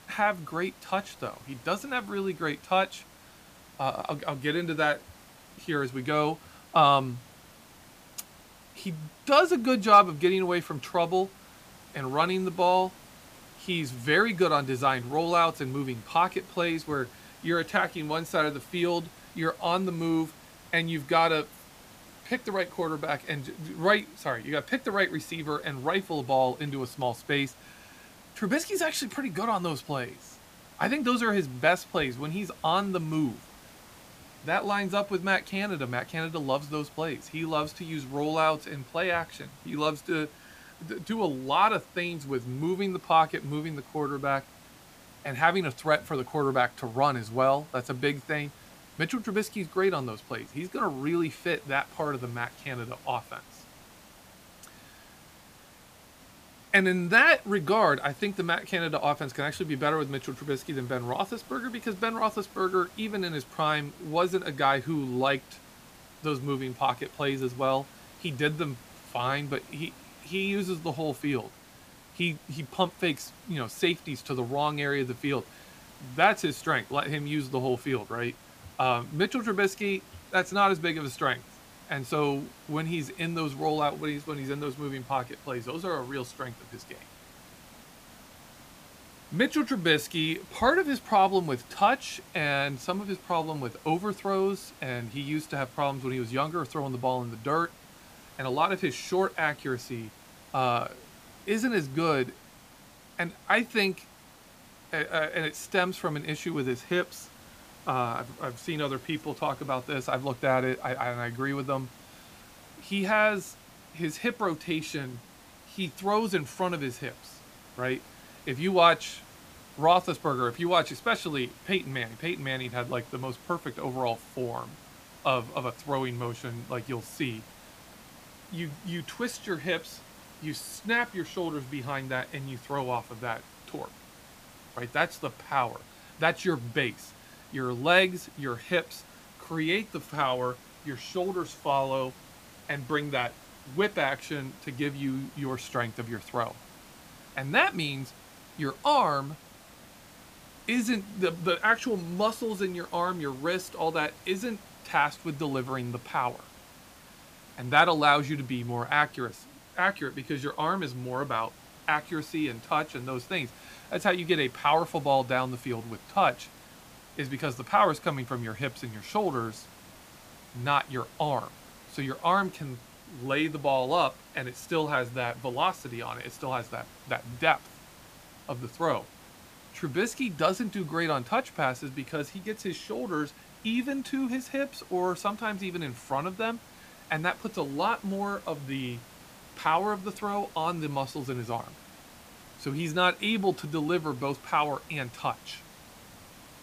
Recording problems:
hiss; faint; throughout; 20 dB below the speech

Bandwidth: 15 kHz